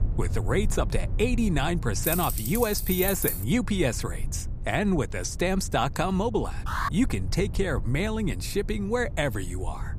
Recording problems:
low rumble; noticeable; throughout; 20 dB below the speech
jangling keys; loud; from 2 to 3.5 s; peak level with the speech
alarm; noticeable; at 6.5 s; peak 3 dB below the speech

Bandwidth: 15 kHz